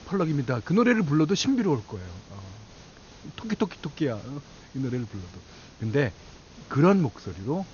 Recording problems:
high frequencies cut off; noticeable; nothing above 6.5 kHz
hiss; faint; throughout; 25 dB below the speech

